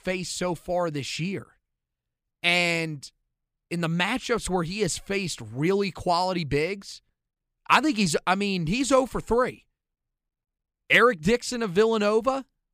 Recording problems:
none

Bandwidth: 15 kHz